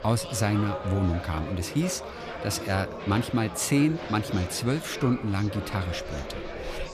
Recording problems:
murmuring crowd; loud; throughout; 9 dB below the speech

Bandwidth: 15 kHz